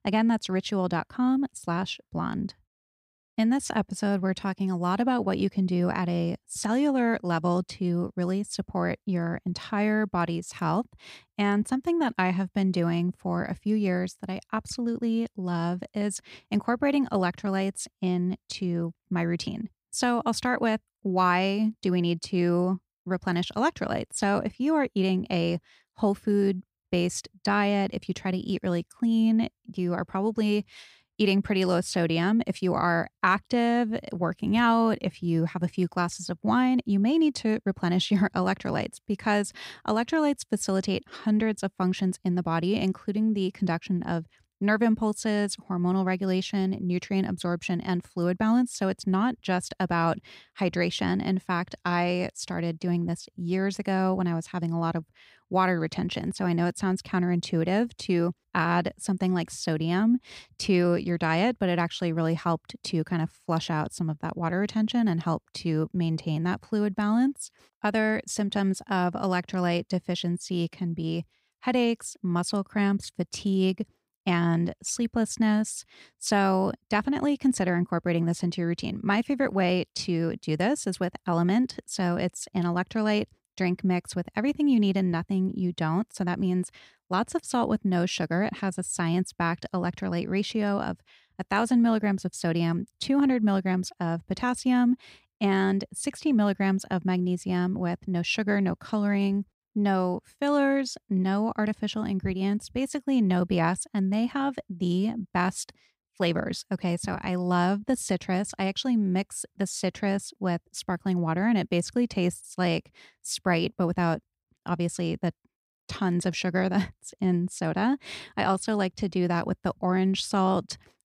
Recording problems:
none

